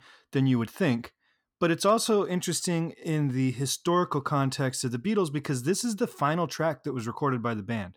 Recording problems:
none

